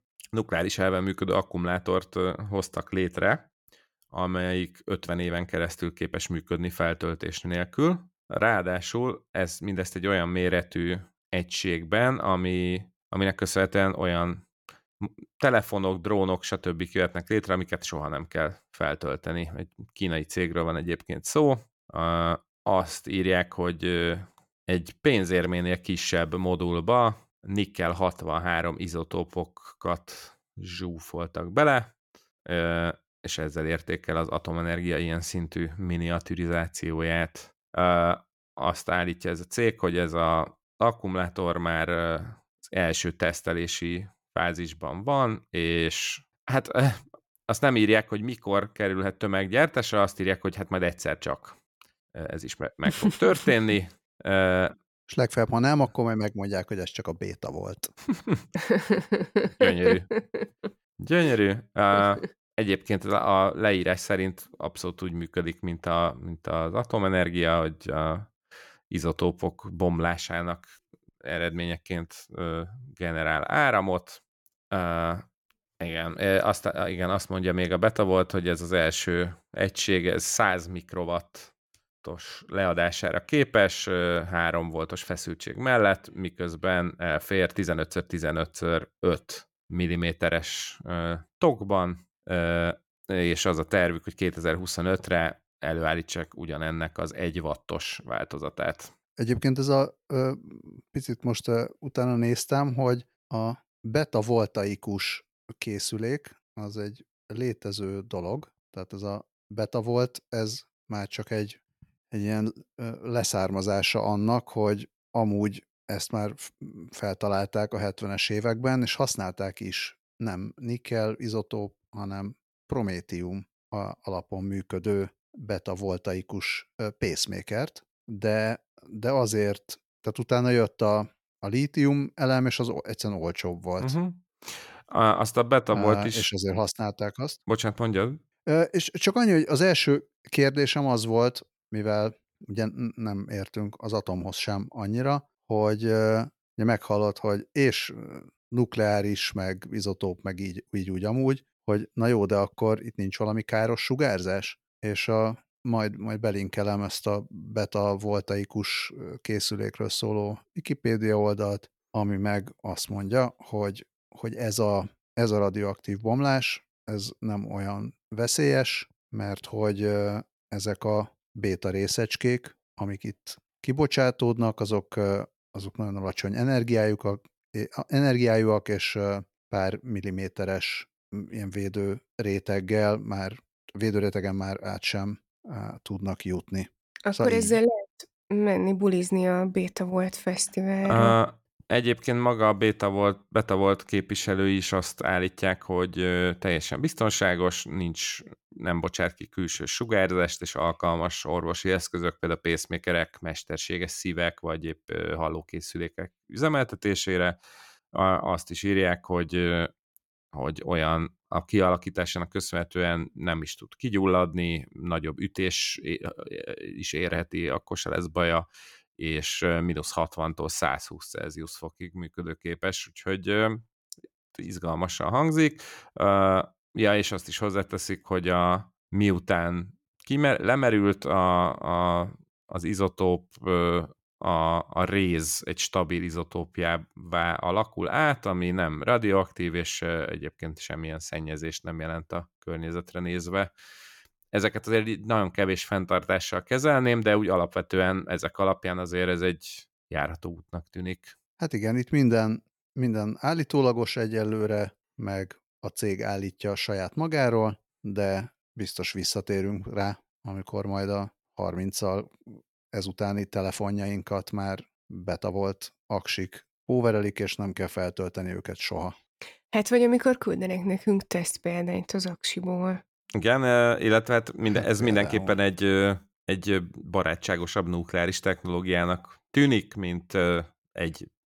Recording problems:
none

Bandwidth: 17 kHz